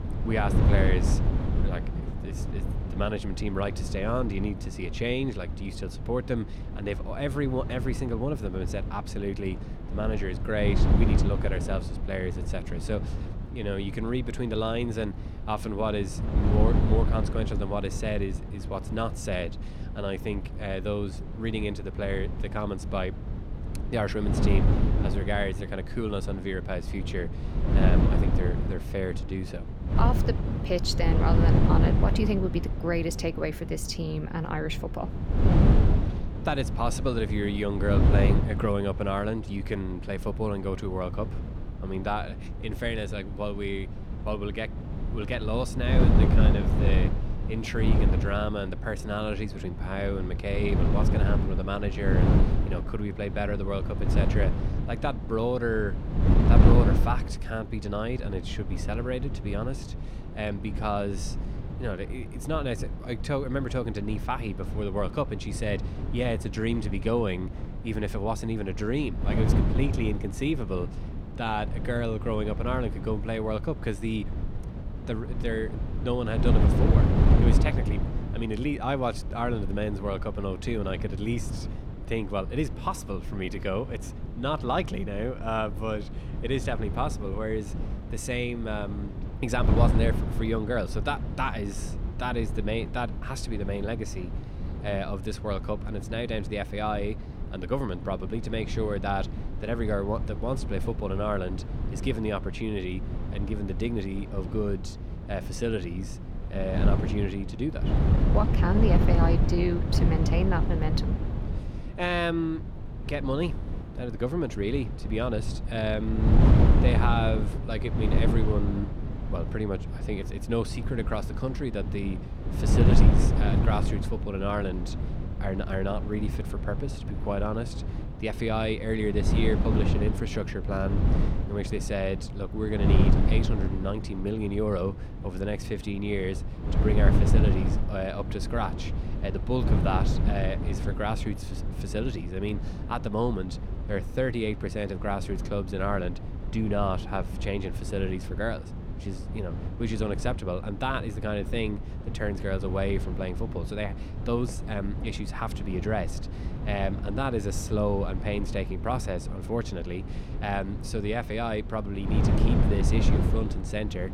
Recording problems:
wind noise on the microphone; heavy; 6 dB below the speech

